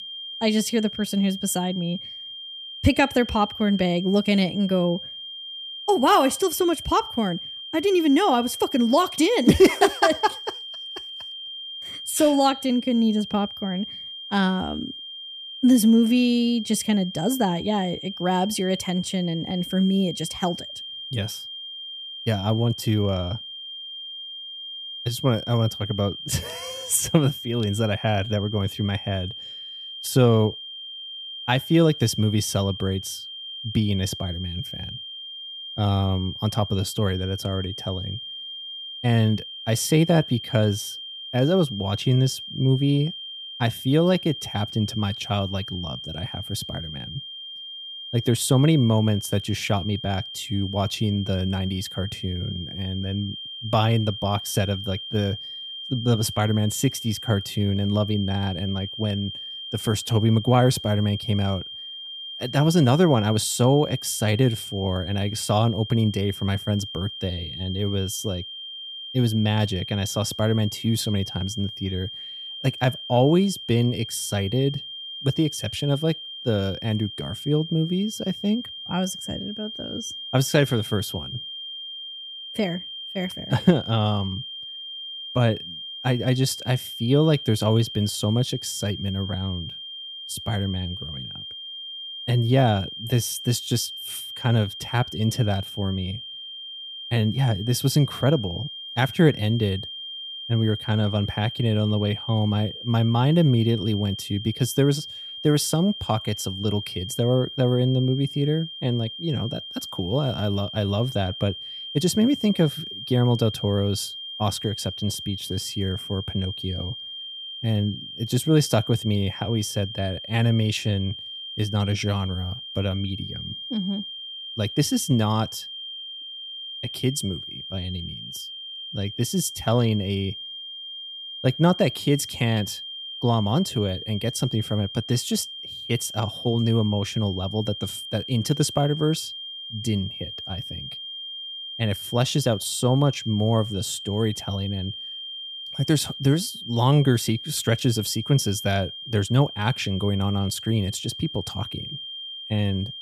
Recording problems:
high-pitched whine; loud; throughout; 3 kHz, 10 dB below the speech

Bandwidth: 14.5 kHz